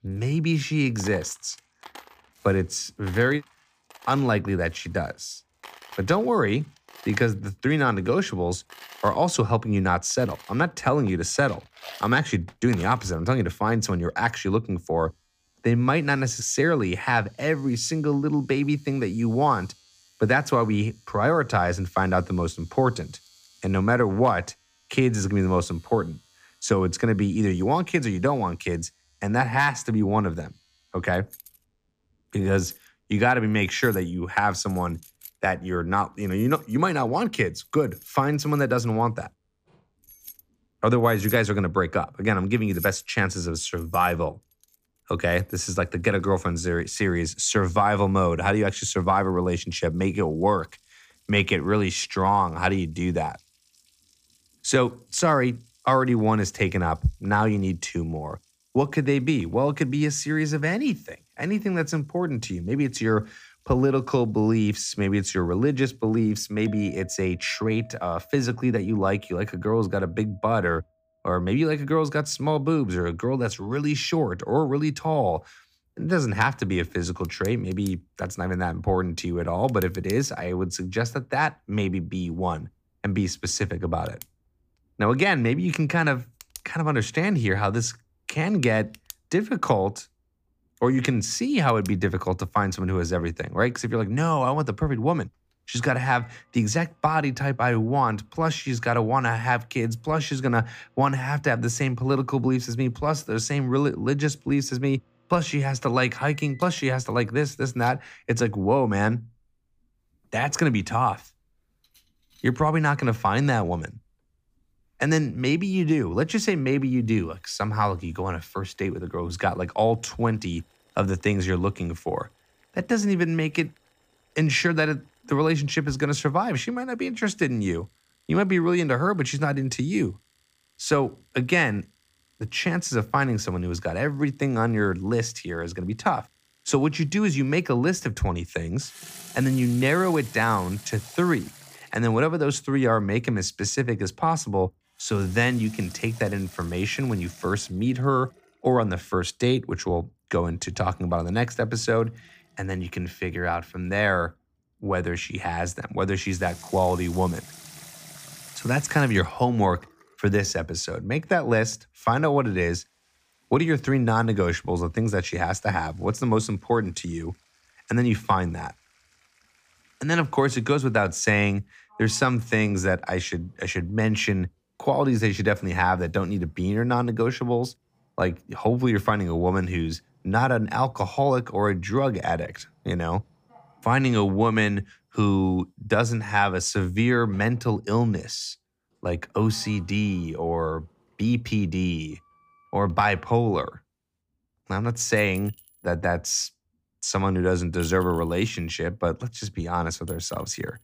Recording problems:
household noises; faint; throughout; 20 dB below the speech

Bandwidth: 15 kHz